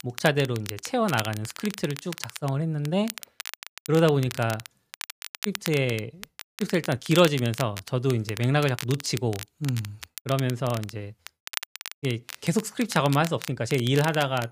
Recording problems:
crackle, like an old record; noticeable; 10 dB below the speech

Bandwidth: 15 kHz